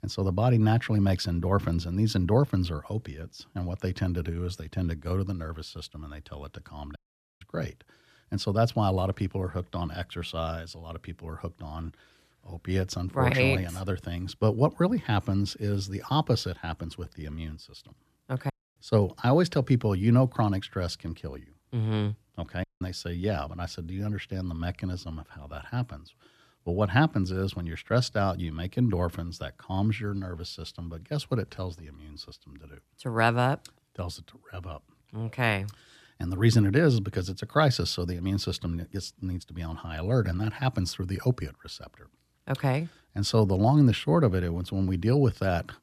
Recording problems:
audio cutting out; at 7 s, at 19 s and at 23 s

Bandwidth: 14.5 kHz